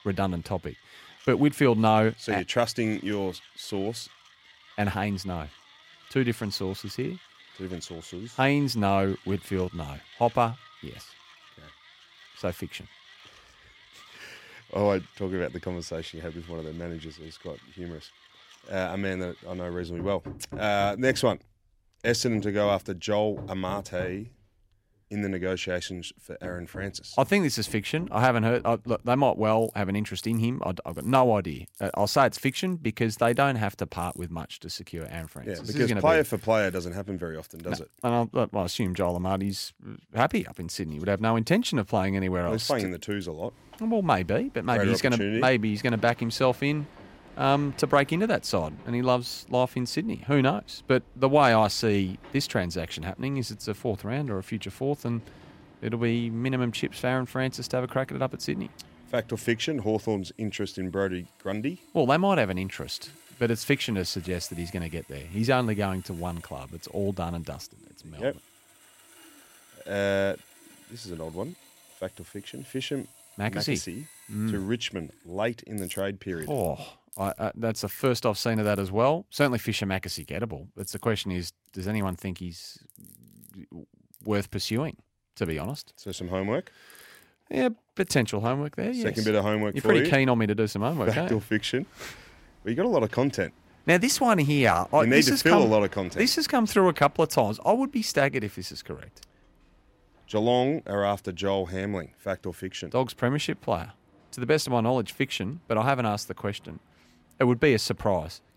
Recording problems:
machinery noise; faint; throughout; 25 dB below the speech

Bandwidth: 16 kHz